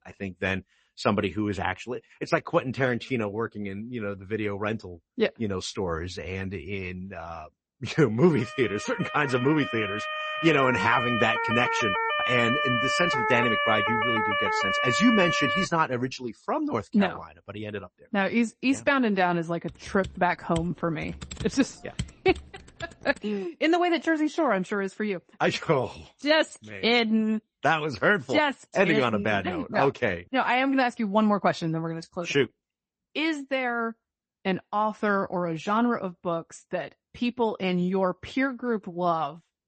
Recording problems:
garbled, watery; slightly; nothing above 8 kHz
siren; loud; from 8.5 to 16 s; peak 3 dB above the speech
keyboard typing; noticeable; from 20 to 23 s; peak 10 dB below the speech

